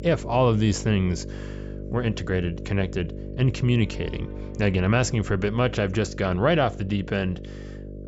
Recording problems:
high frequencies cut off; noticeable; nothing above 8 kHz
electrical hum; noticeable; throughout; 50 Hz, 15 dB below the speech
background music; faint; throughout; 25 dB below the speech

